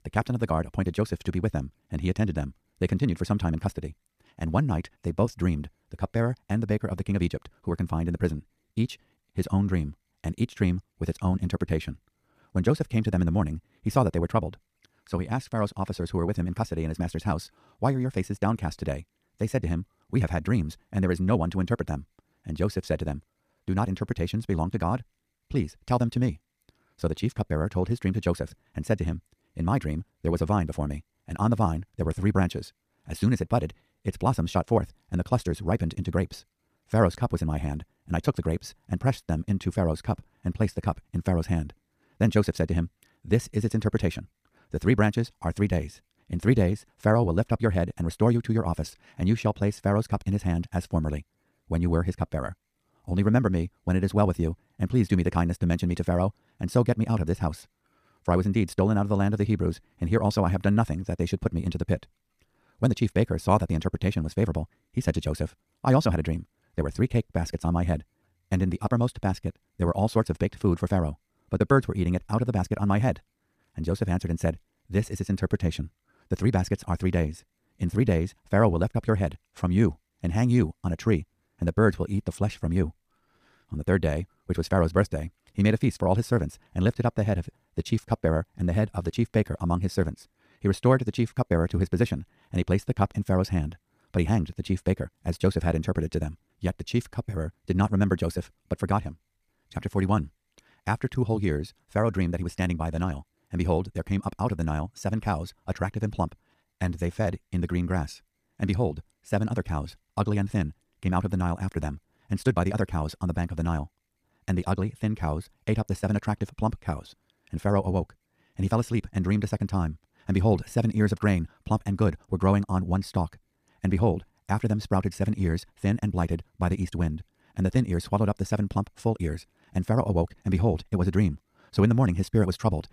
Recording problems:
wrong speed, natural pitch; too fast; 1.7 times normal speed

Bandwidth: 14.5 kHz